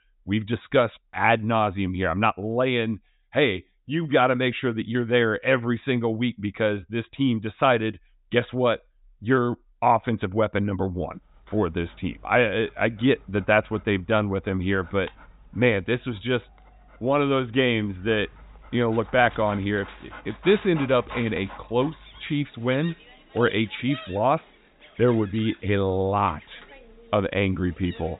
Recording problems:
high frequencies cut off; severe; nothing above 4 kHz
animal sounds; faint; from 12 s on; 20 dB below the speech

